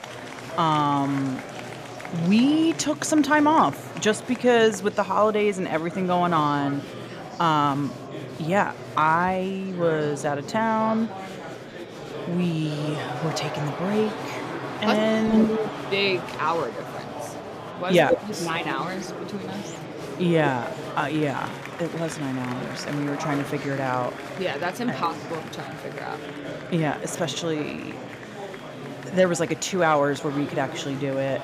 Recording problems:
murmuring crowd; noticeable; throughout; 10 dB below the speech

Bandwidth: 14.5 kHz